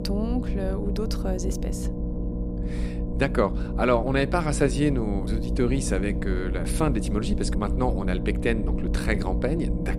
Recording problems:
low rumble; loud; throughout; 9 dB below the speech

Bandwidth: 15.5 kHz